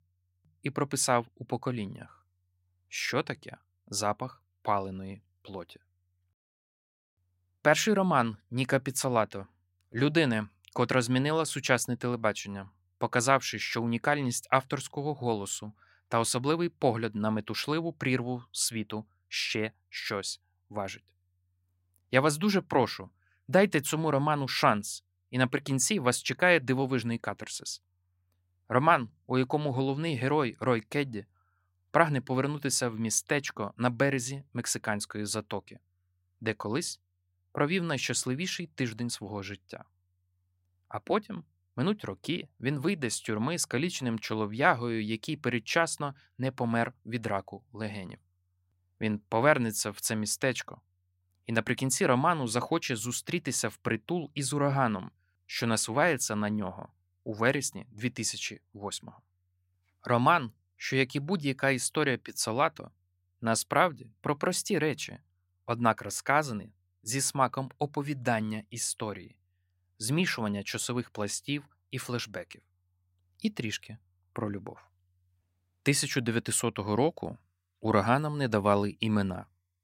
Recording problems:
none

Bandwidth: 16 kHz